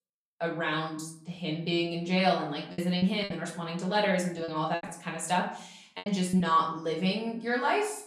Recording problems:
off-mic speech; far
room echo; slight; dies away in 0.5 s
choppy; very; from 2.5 to 5 s and at 6 s; 8% of the speech affected

